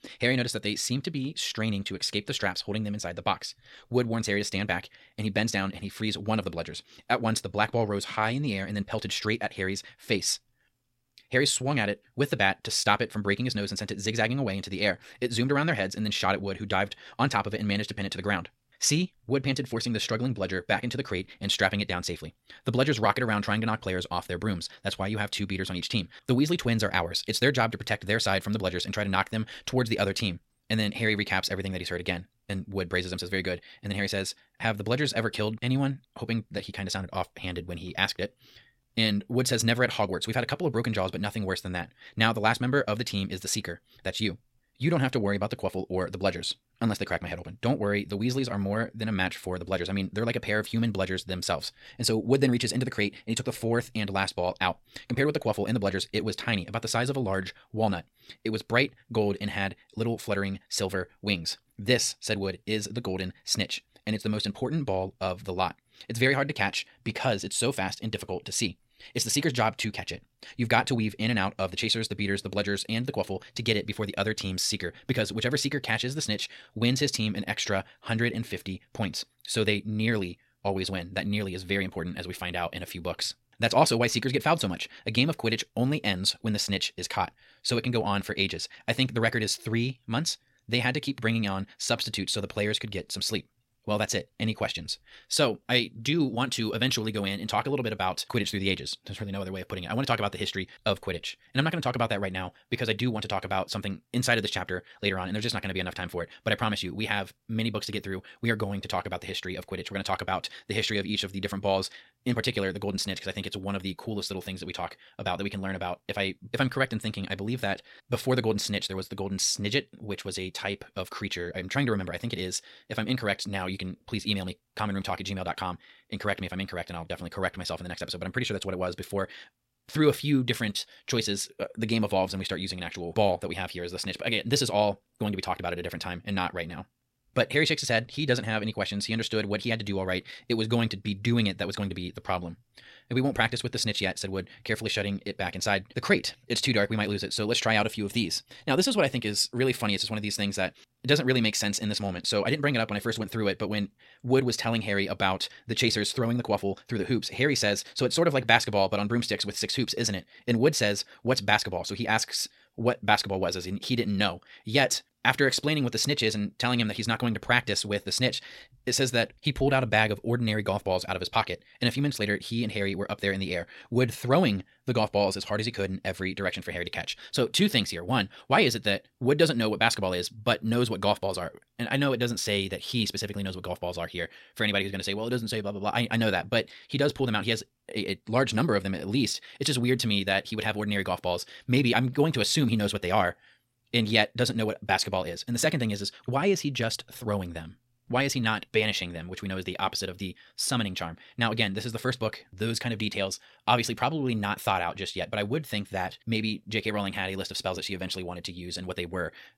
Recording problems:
wrong speed, natural pitch; too fast; 1.6 times normal speed

